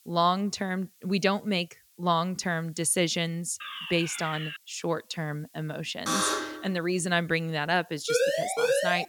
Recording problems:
hiss; faint; throughout; 30 dB below the speech
alarm; noticeable; at 3.5 s; peak 6 dB below the speech
alarm; loud; at 6 s; peak 3 dB above the speech
siren; loud; at 8 s; peak 3 dB above the speech

